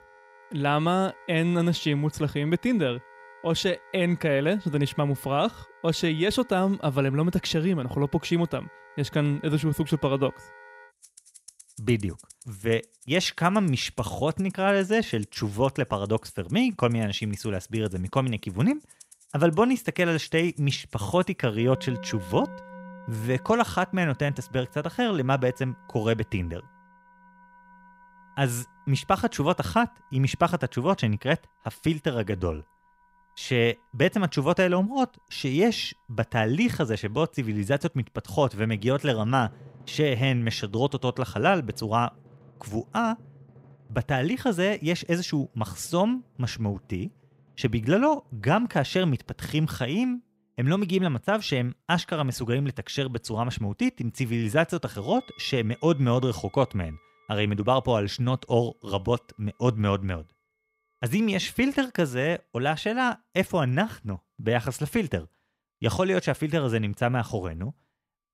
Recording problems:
background music; faint; throughout; 25 dB below the speech

